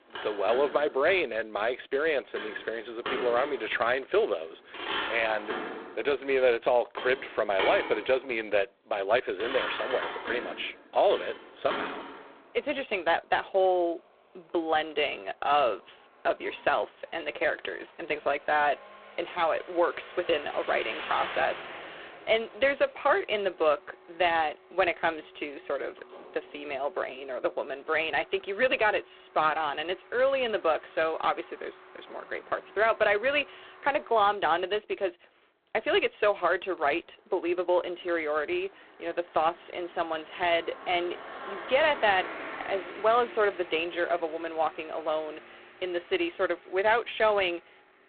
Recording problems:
phone-call audio; poor line
traffic noise; noticeable; throughout; 10 dB below the speech

